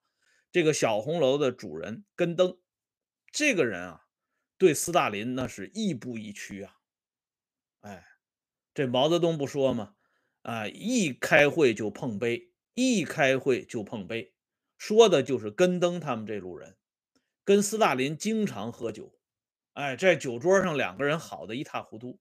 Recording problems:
none

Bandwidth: 15 kHz